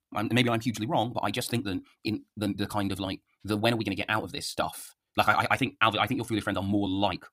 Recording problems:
wrong speed, natural pitch; too fast; 1.6 times normal speed

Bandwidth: 15.5 kHz